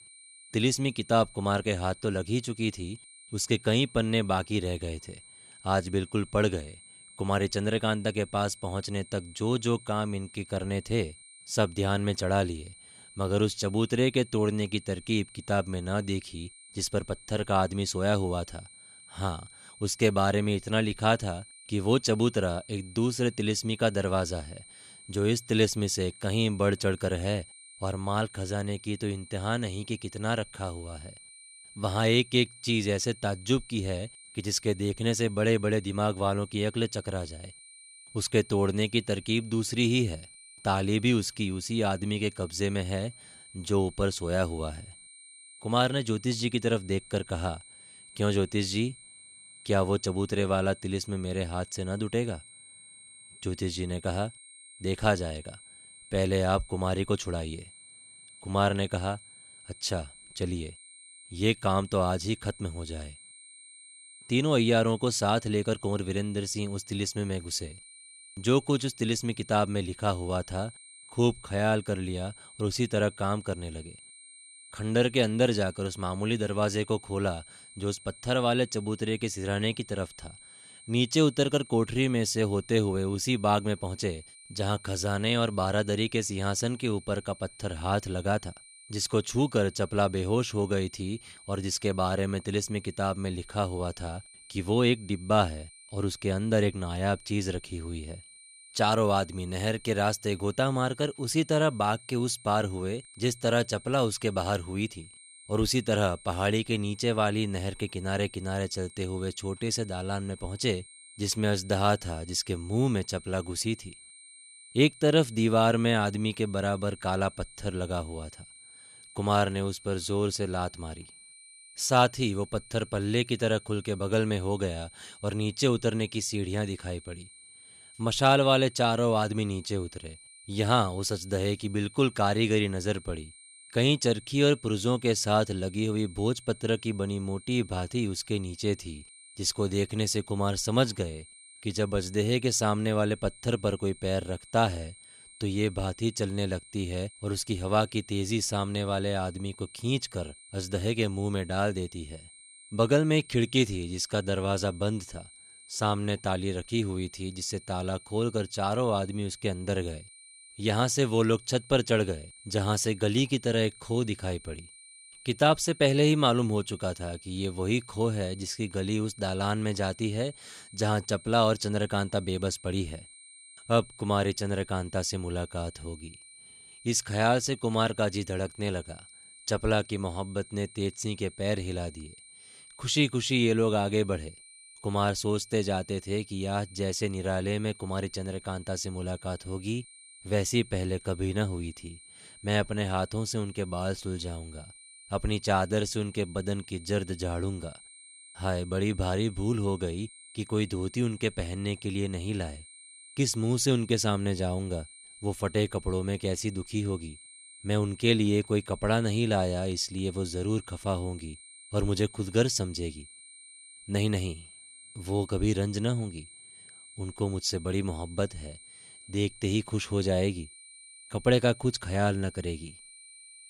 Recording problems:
high-pitched whine; faint; throughout; 9 kHz, 20 dB below the speech

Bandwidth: 14 kHz